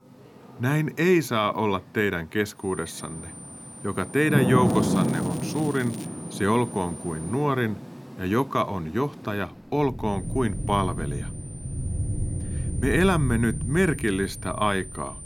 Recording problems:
rain or running water; loud; throughout; 5 dB below the speech
high-pitched whine; noticeable; from 2.5 to 7.5 s and from 10 s on; 9 kHz, 15 dB below the speech
crackling; noticeable; from 4.5 to 6 s; 20 dB below the speech

